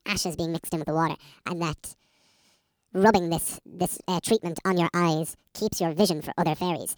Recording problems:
wrong speed and pitch; too fast and too high; 1.7 times normal speed

